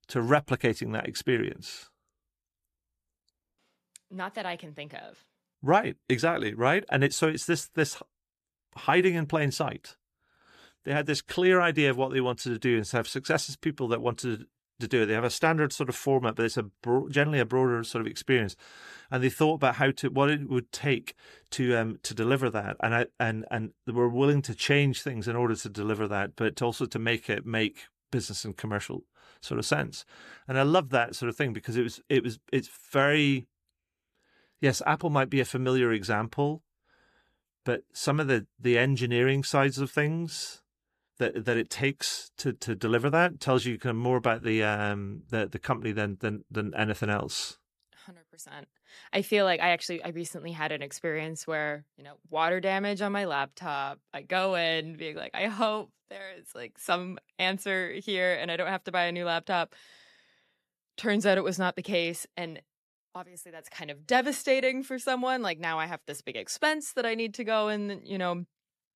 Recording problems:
none

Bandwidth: 14 kHz